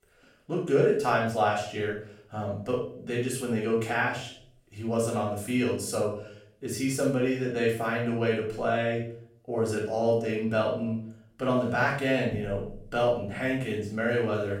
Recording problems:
off-mic speech; far
room echo; noticeable; dies away in 0.5 s

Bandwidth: 16.5 kHz